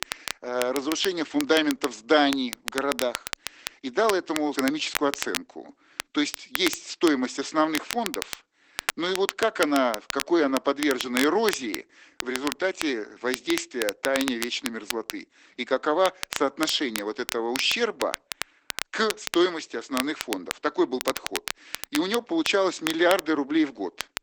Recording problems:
garbled, watery; badly; nothing above 8 kHz
thin; somewhat; fading below 300 Hz
crackle, like an old record; loud; 8 dB below the speech

